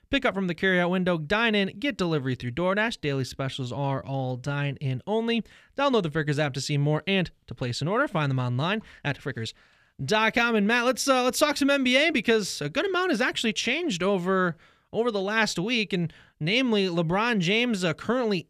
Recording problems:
uneven, jittery; strongly; from 2 to 15 s

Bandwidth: 14.5 kHz